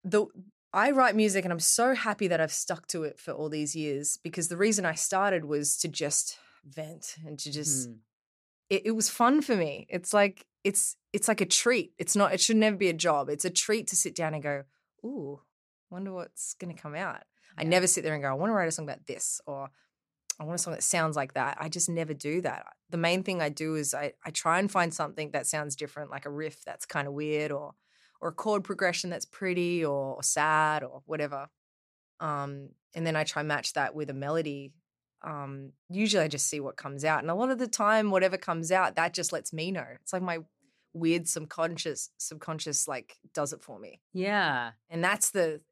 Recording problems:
none

